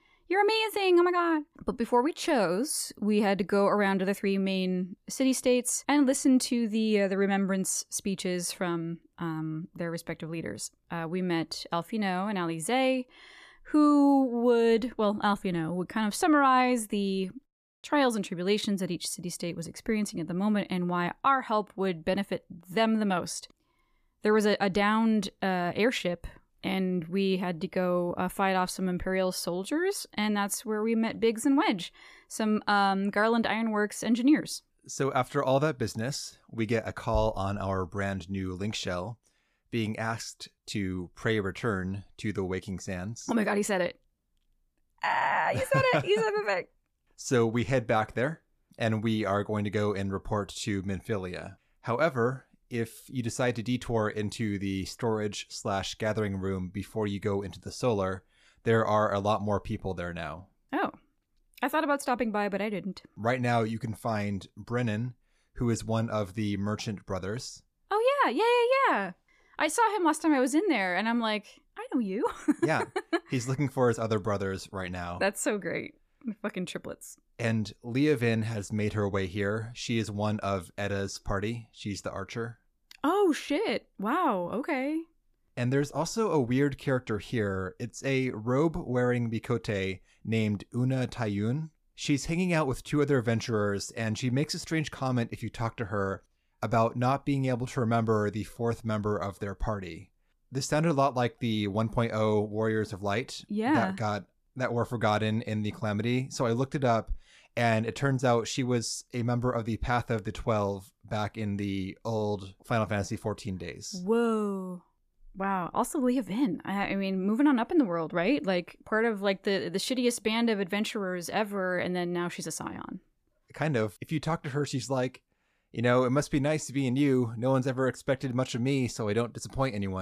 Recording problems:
abrupt cut into speech; at the end

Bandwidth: 14.5 kHz